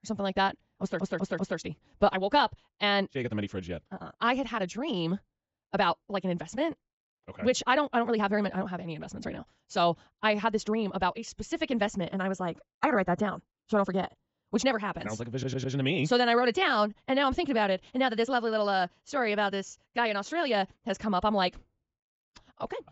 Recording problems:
wrong speed, natural pitch; too fast; 1.5 times normal speed
high frequencies cut off; noticeable; nothing above 7.5 kHz
audio stuttering; at 1 s and at 15 s

